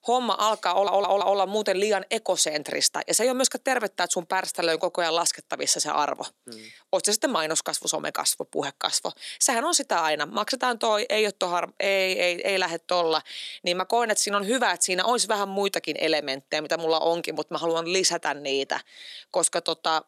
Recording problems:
thin; somewhat; fading below 300 Hz
audio stuttering; at 0.5 s

